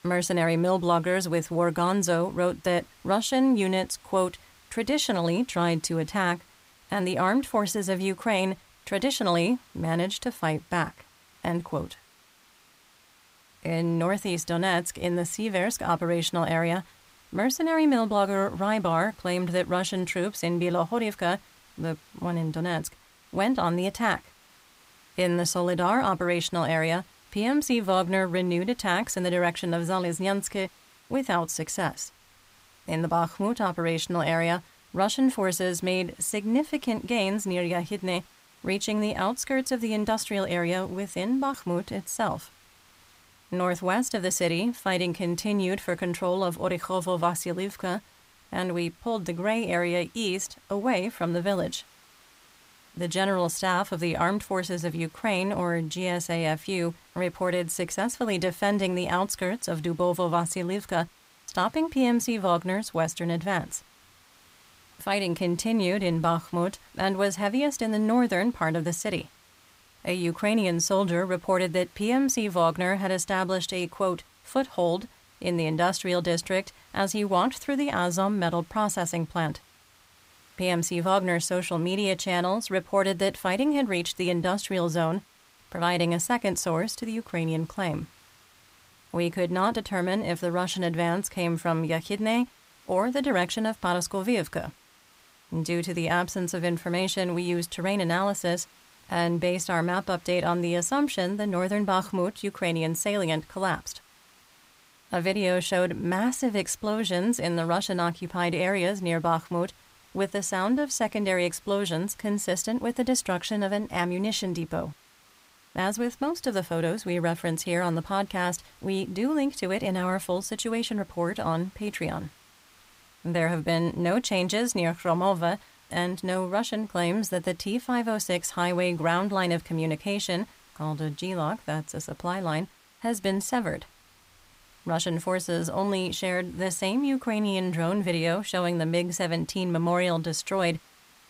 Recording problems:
hiss; faint; throughout; 30 dB below the speech

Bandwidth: 15.5 kHz